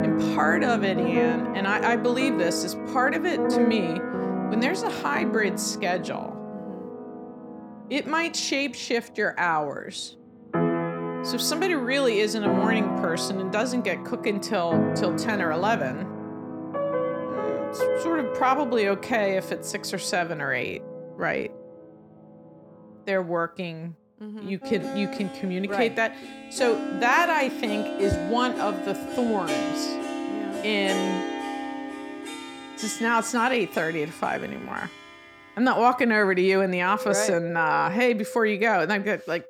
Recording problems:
background music; loud; throughout; 5 dB below the speech

